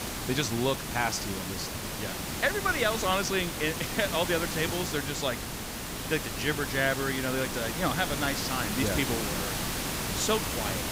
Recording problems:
hiss; loud; throughout; 2 dB below the speech

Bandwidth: 15.5 kHz